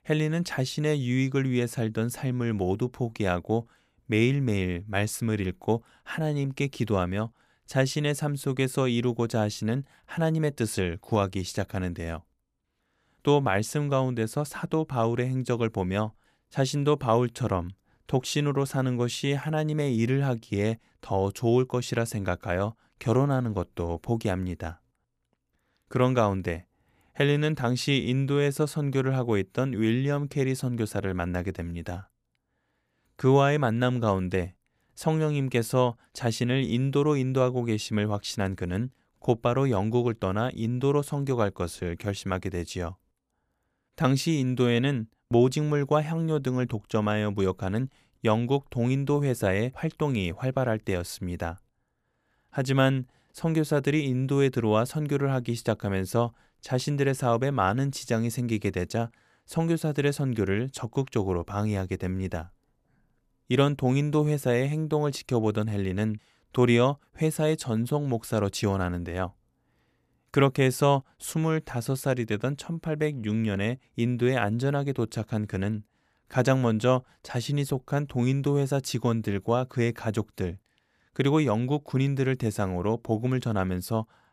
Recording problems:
none

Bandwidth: 14.5 kHz